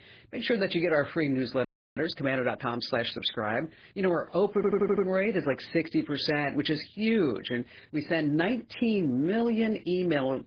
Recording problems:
garbled, watery; badly
audio freezing; at 1.5 s
audio stuttering; at 4.5 s

